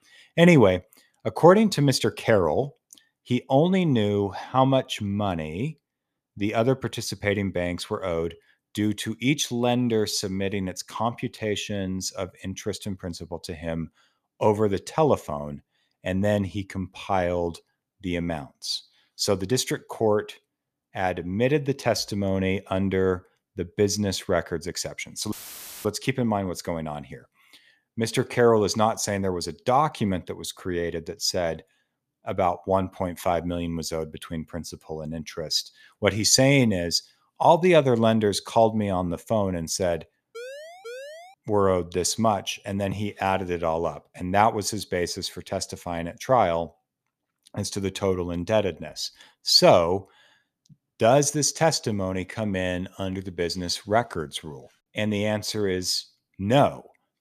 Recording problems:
audio cutting out; filled with static; at 25 s for 0.5 s
siren; faint; at 40 s; peak 15 dB below the speech

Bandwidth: 14.5 kHz